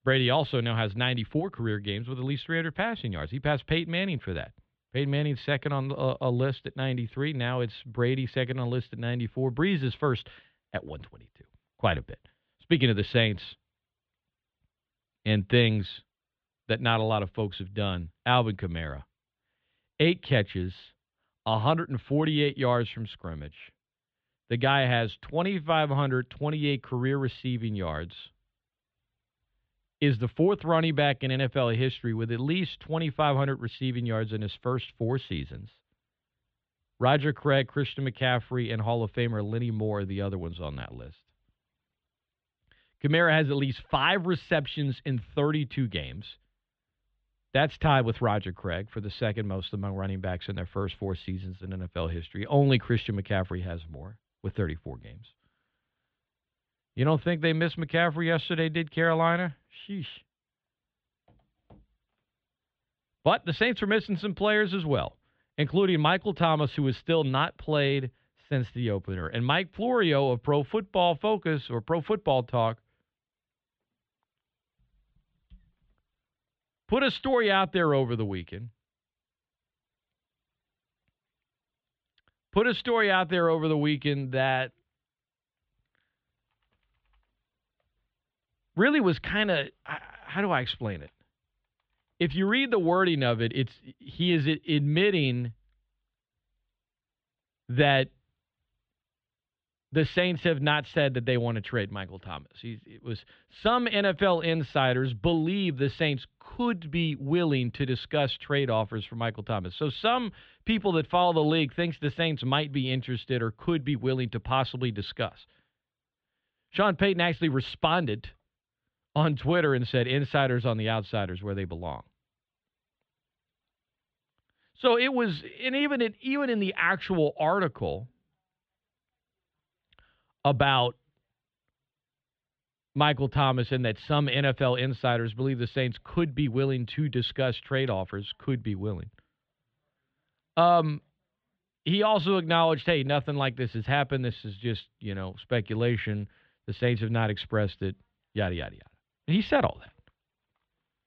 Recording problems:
muffled; slightly; fading above 3.5 kHz

